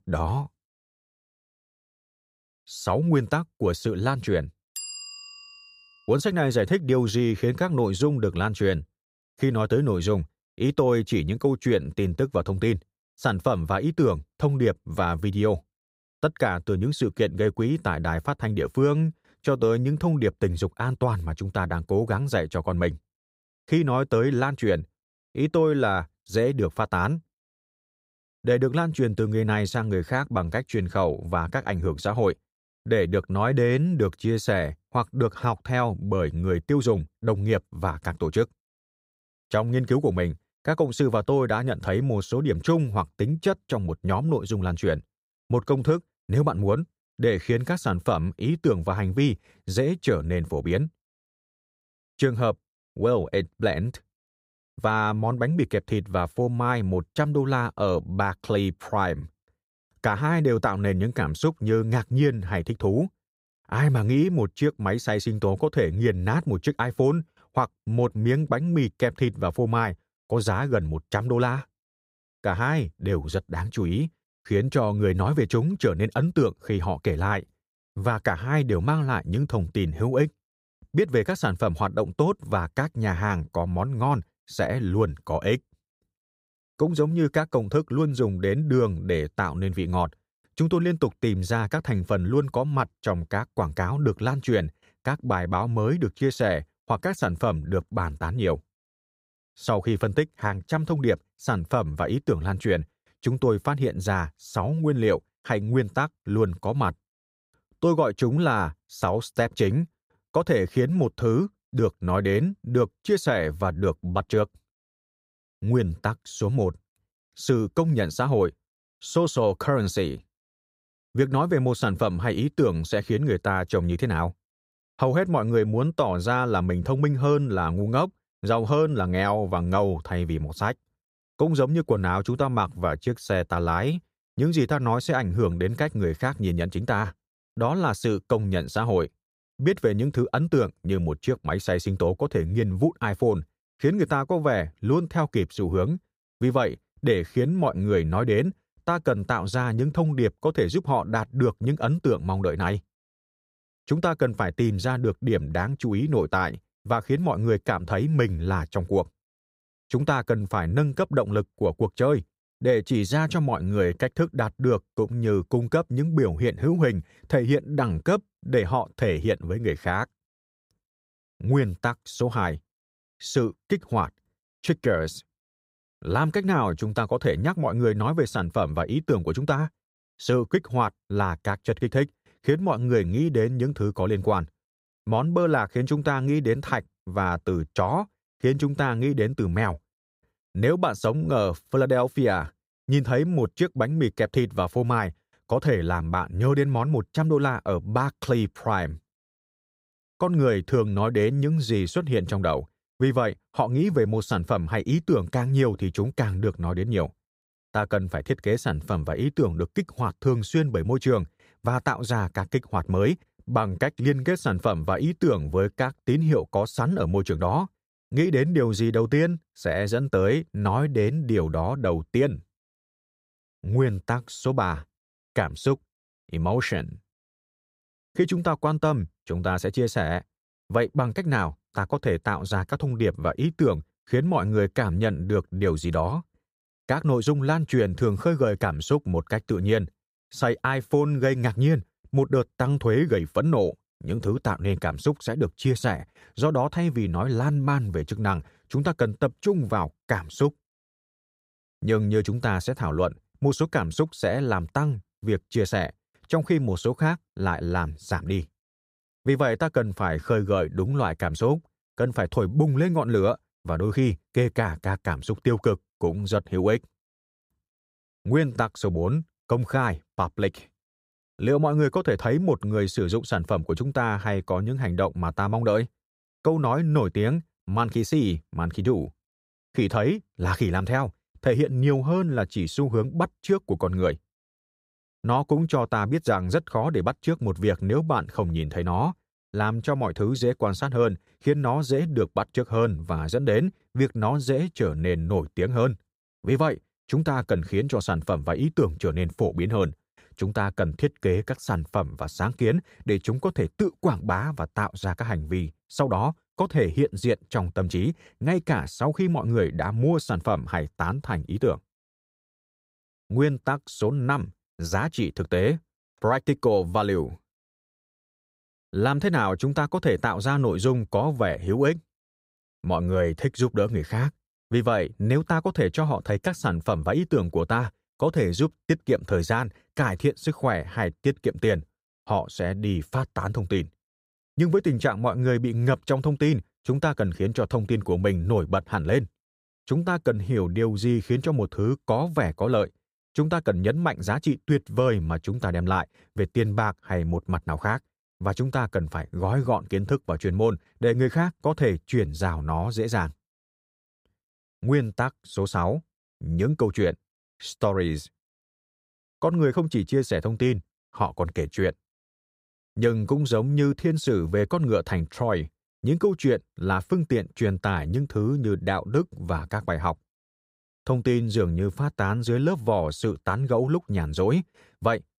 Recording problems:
none

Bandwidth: 15.5 kHz